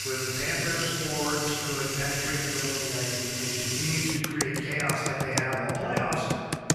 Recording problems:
room echo; strong; dies away in 2.5 s
off-mic speech; far
household noises; loud; throughout; as loud as the speech

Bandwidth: 14 kHz